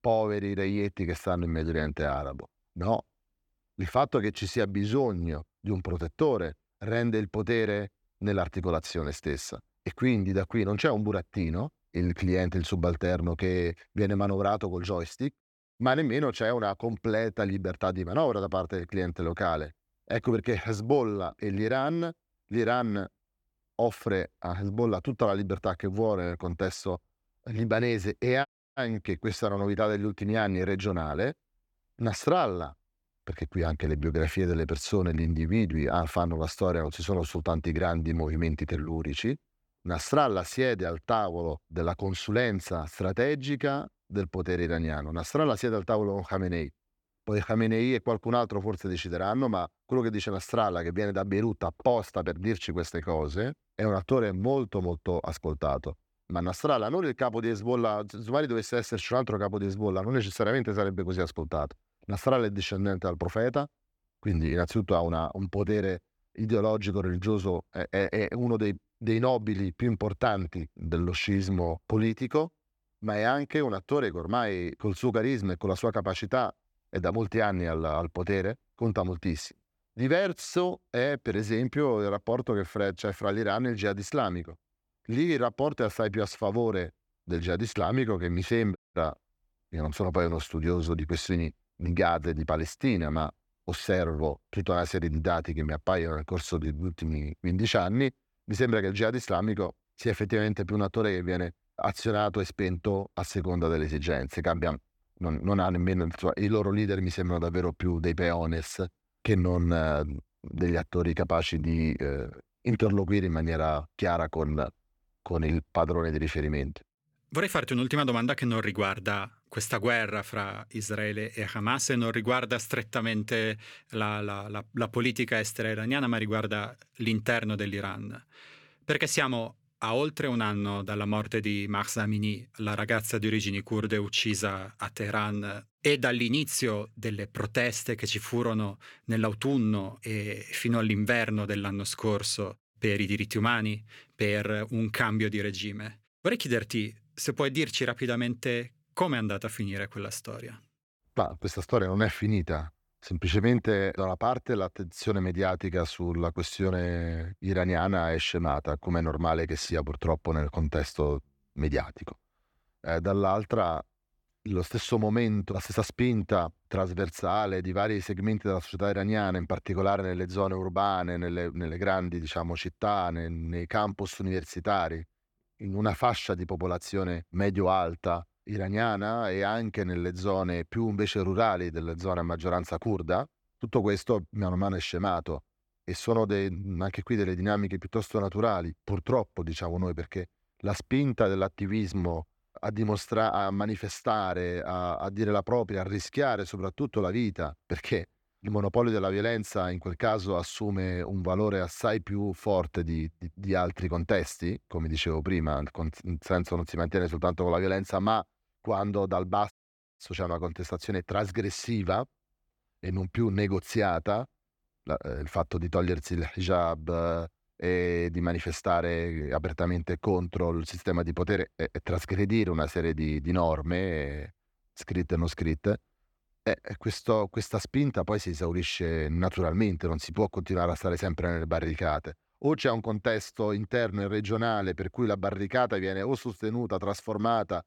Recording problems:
audio cutting out; at 28 s, at 1:29 and at 3:30

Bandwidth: 18 kHz